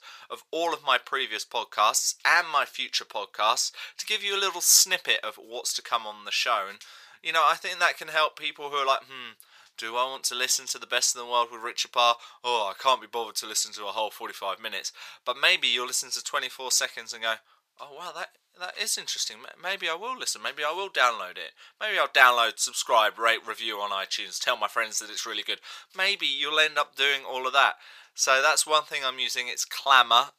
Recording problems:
thin; very; fading below 1 kHz

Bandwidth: 15 kHz